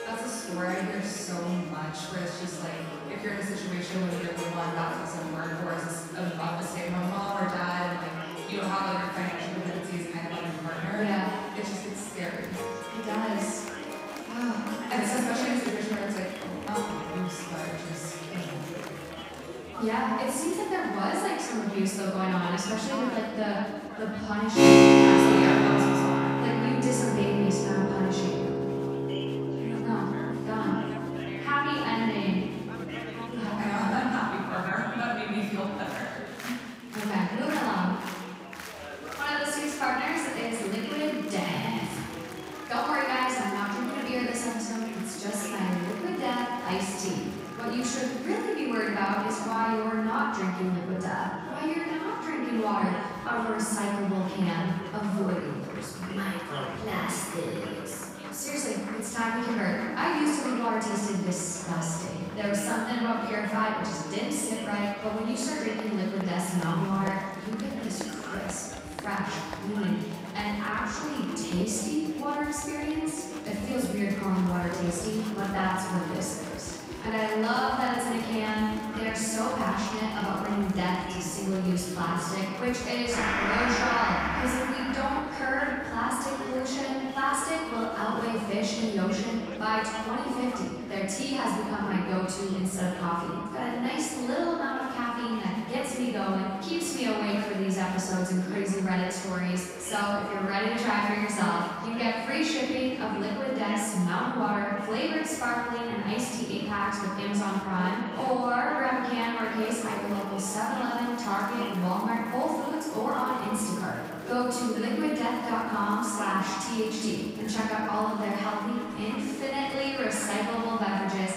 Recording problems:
room echo; strong; dies away in 1.5 s
off-mic speech; far
background music; very loud; throughout; as loud as the speech
chatter from many people; noticeable; throughout; 10 dB below the speech

